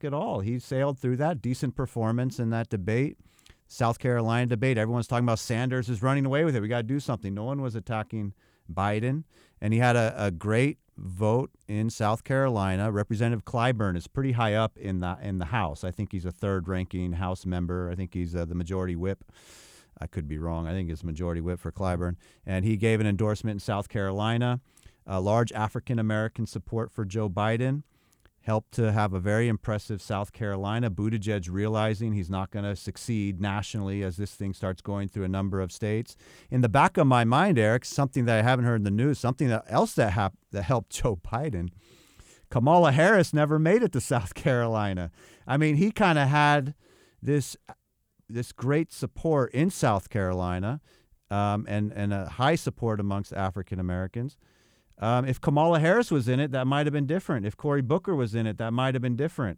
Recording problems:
none

